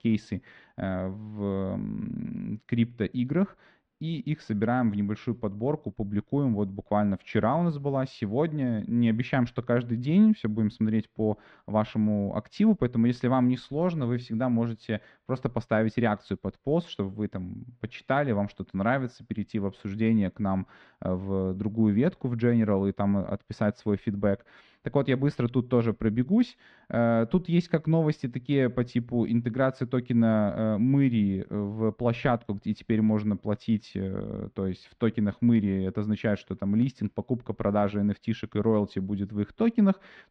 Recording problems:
muffled; slightly; fading above 3.5 kHz

